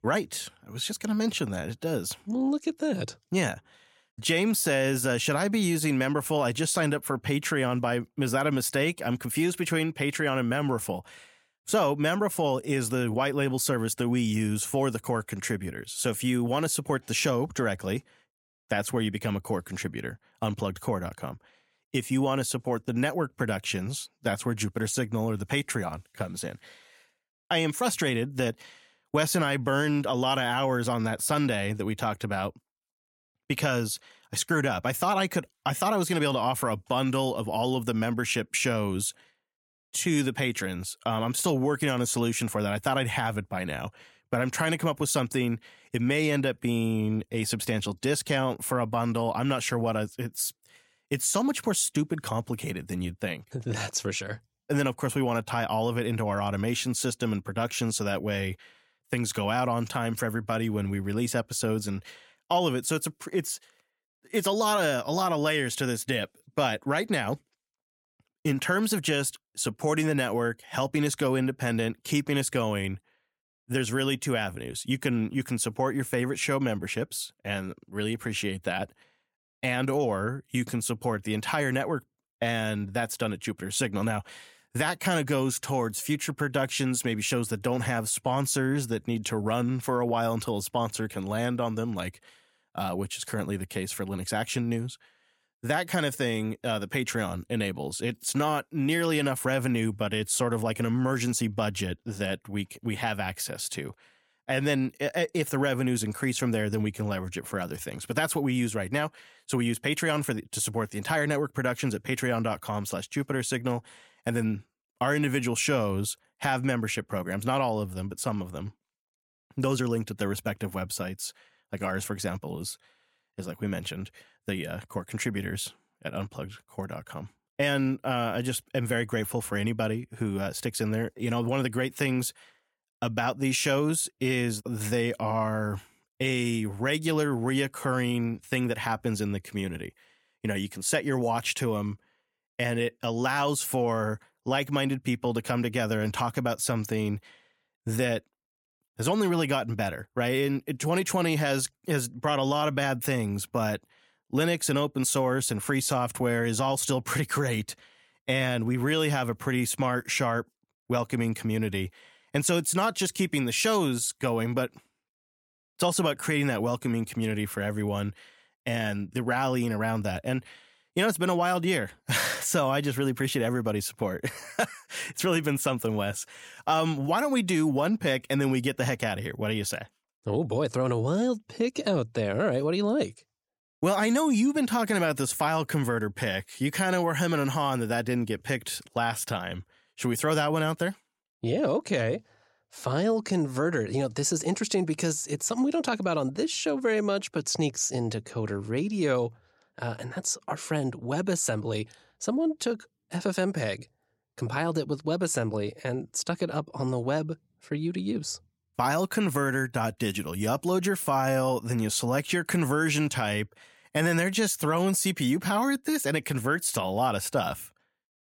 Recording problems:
none

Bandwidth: 17 kHz